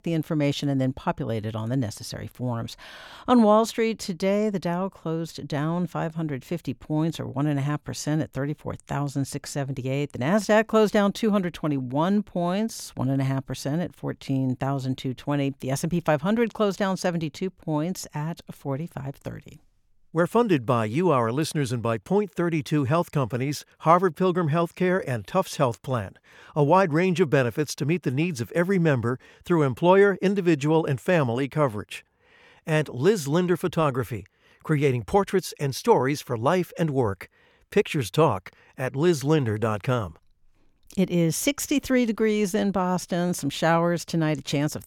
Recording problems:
none

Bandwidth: 17.5 kHz